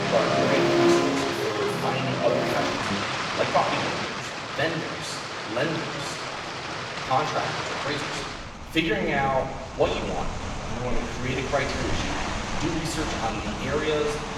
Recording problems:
off-mic speech; far
room echo; noticeable; dies away in 1.1 s
background music; very loud; until 3 s; 3 dB above the speech
rain or running water; loud; throughout; 2 dB below the speech
uneven, jittery; strongly; from 1.5 to 14 s

